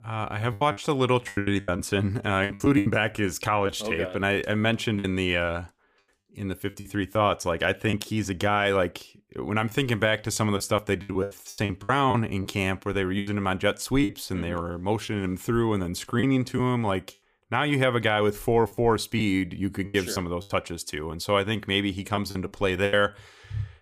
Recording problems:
choppy; very; 9% of the speech affected

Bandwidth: 15 kHz